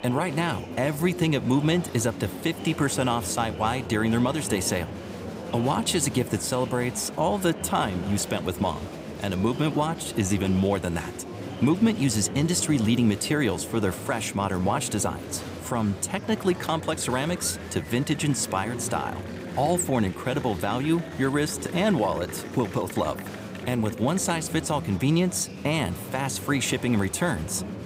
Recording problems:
murmuring crowd; noticeable; throughout; 10 dB below the speech

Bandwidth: 15.5 kHz